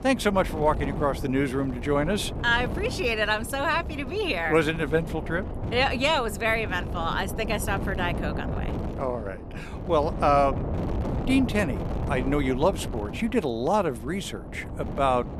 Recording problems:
wind noise on the microphone; occasional gusts; 15 dB below the speech

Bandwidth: 13.5 kHz